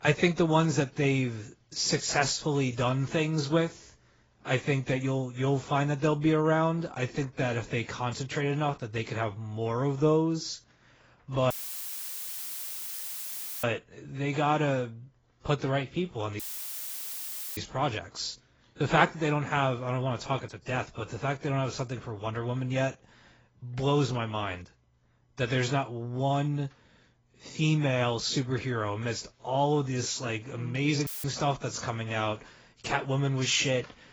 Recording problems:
garbled, watery; badly; nothing above 7.5 kHz
audio cutting out; filled with static; at 12 s for 2 s, at 16 s for 1 s and at 31 s

